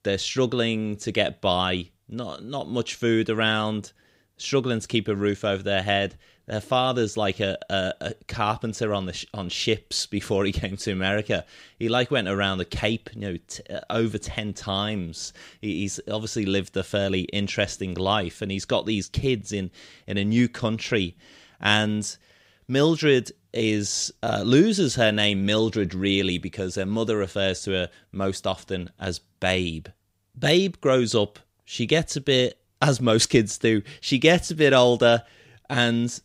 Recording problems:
none

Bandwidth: 15.5 kHz